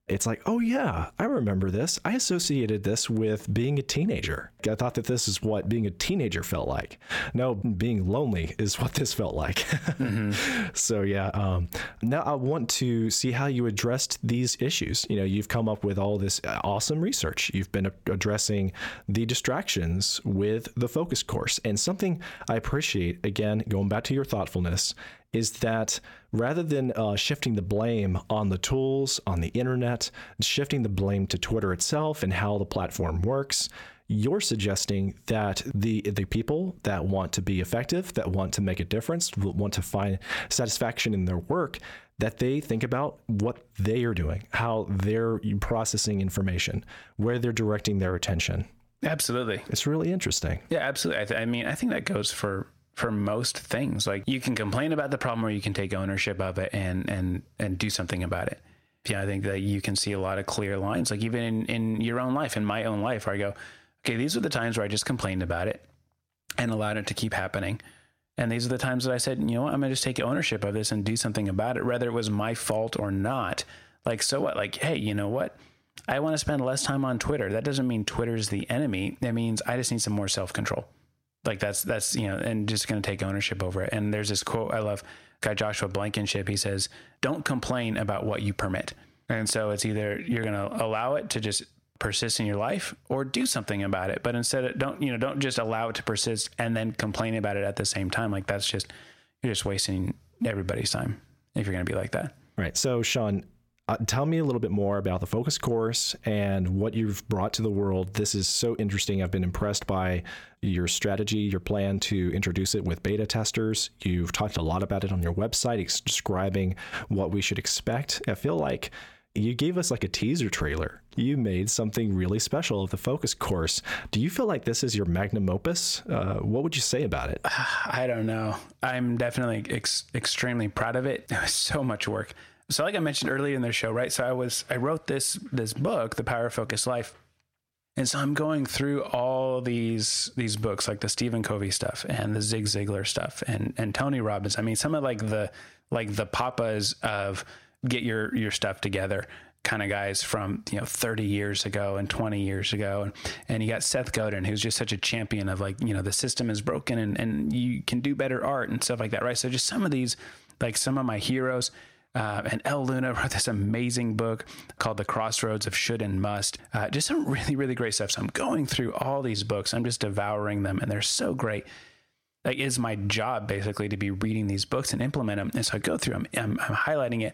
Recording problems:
squashed, flat; somewhat

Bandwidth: 17 kHz